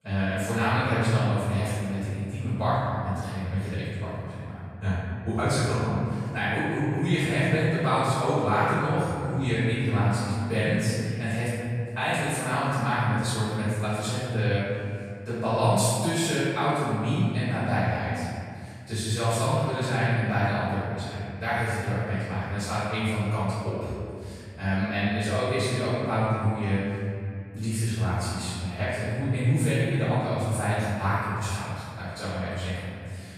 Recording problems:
room echo; strong; dies away in 2.3 s
off-mic speech; far

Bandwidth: 13.5 kHz